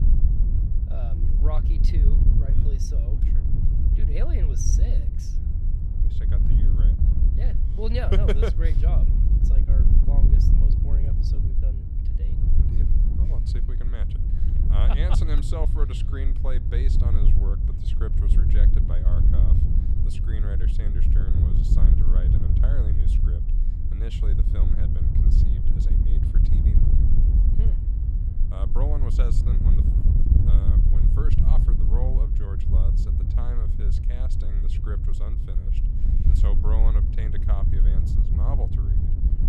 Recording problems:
wind noise on the microphone; heavy; 1 dB below the speech

